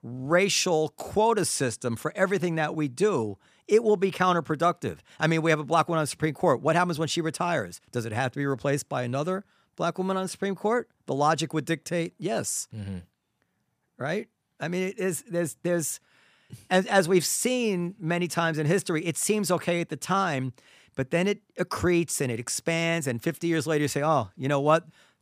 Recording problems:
none

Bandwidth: 15 kHz